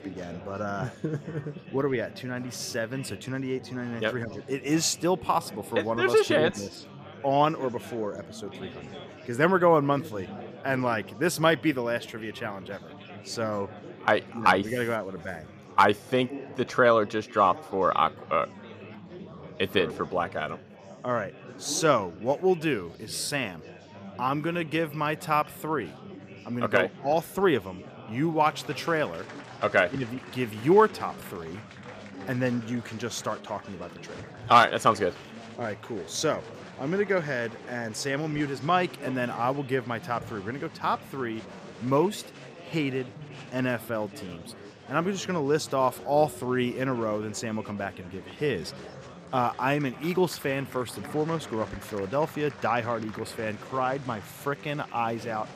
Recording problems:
murmuring crowd; noticeable; throughout; 15 dB below the speech

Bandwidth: 14.5 kHz